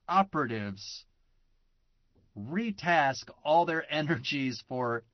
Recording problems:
high frequencies cut off; noticeable; nothing above 6 kHz
garbled, watery; slightly

